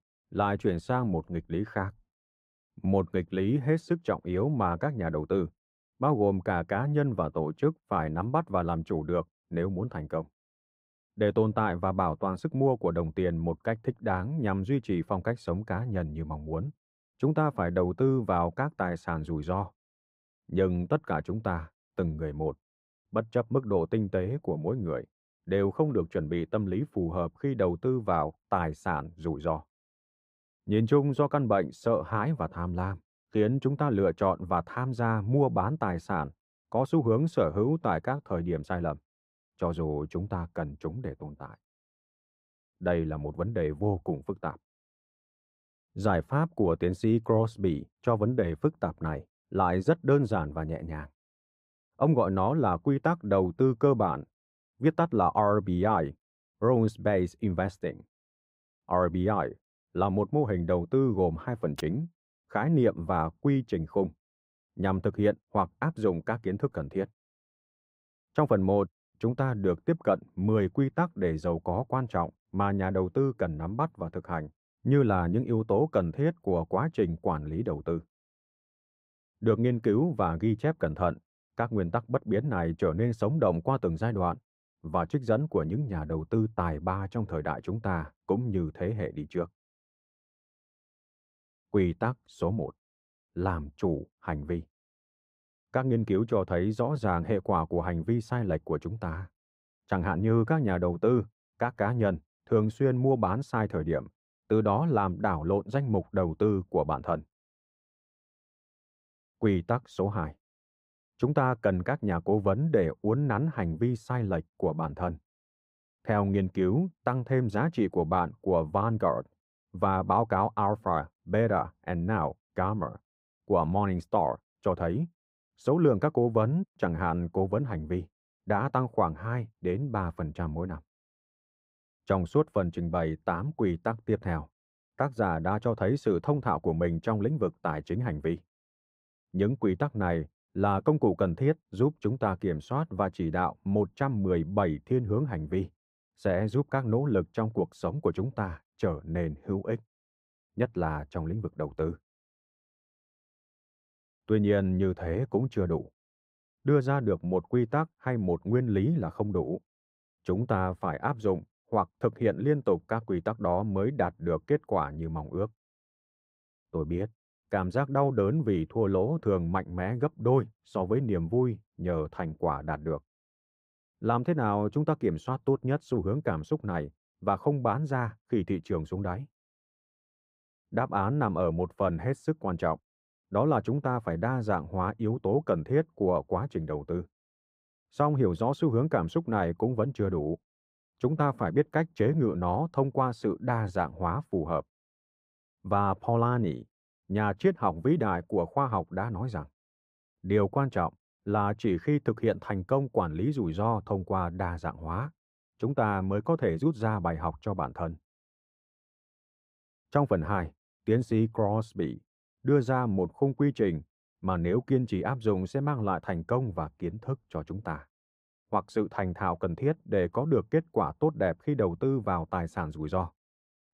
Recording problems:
muffled; slightly; fading above 2 kHz

